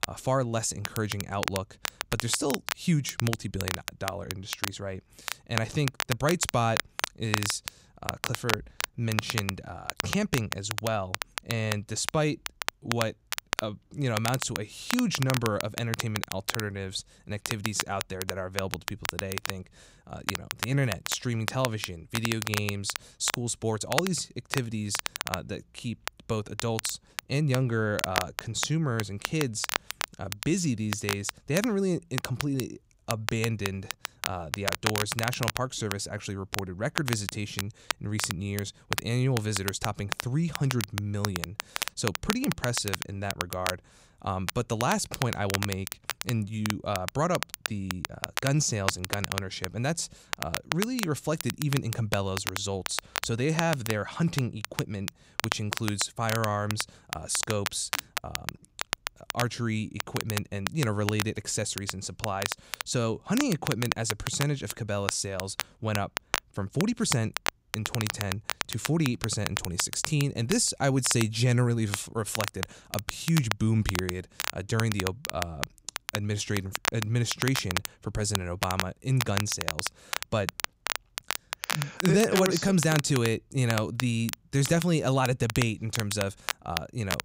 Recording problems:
crackle, like an old record; loud; 4 dB below the speech

